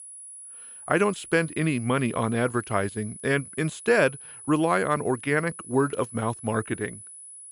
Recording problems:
high-pitched whine; noticeable; throughout; 10 kHz, 15 dB below the speech

